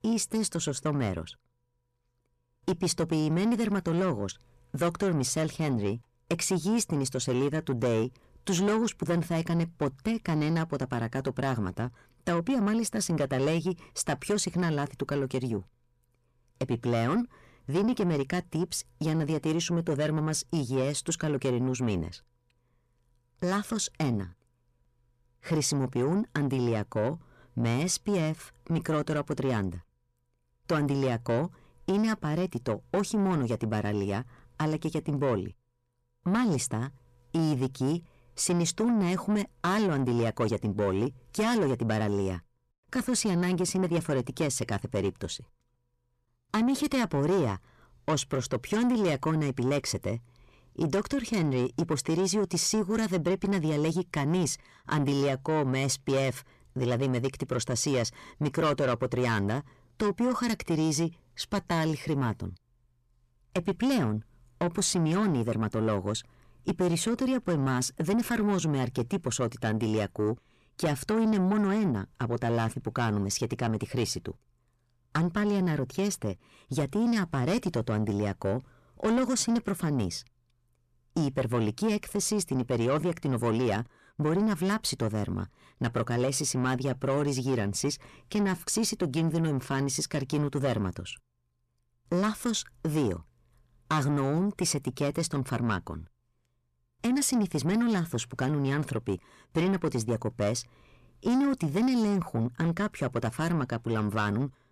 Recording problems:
distortion; slight; 10 dB below the speech

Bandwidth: 14 kHz